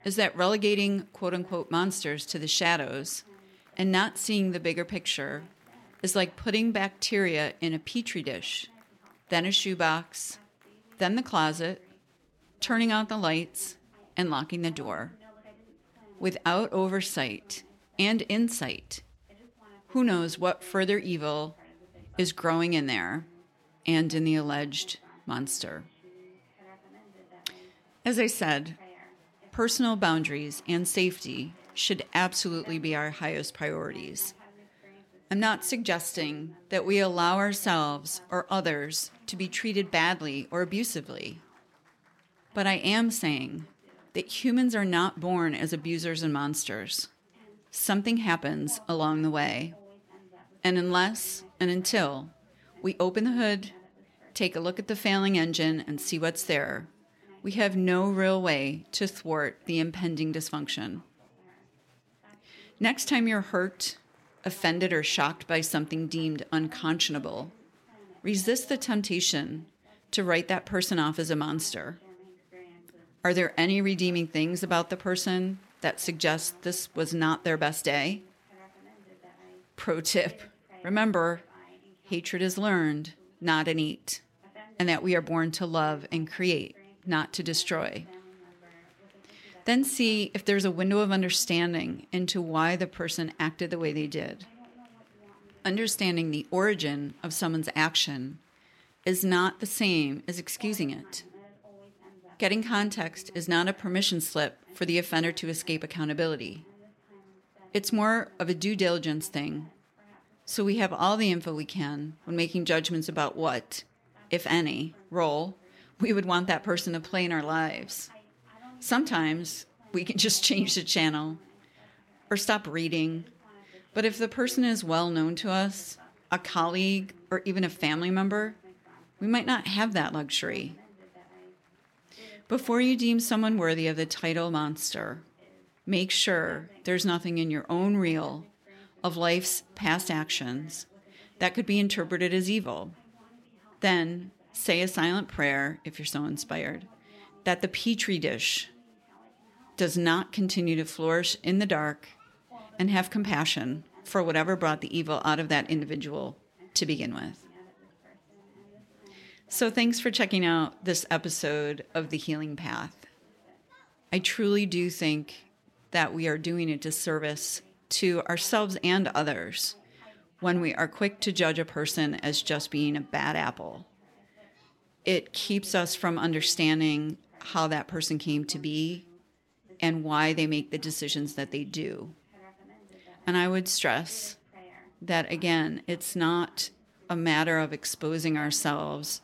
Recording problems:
chatter from many people; faint; throughout; 30 dB below the speech

